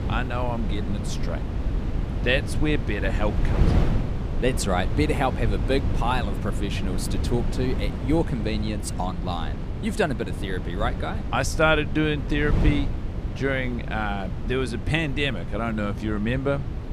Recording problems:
wind noise on the microphone; heavy; 10 dB below the speech

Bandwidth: 15 kHz